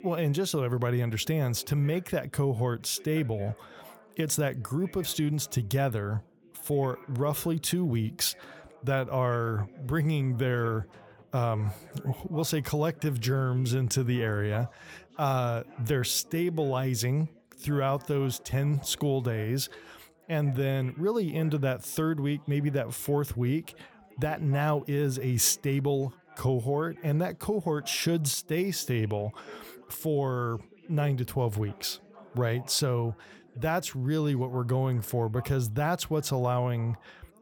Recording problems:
background chatter; faint; throughout; 4 voices, 25 dB below the speech

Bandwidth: 19 kHz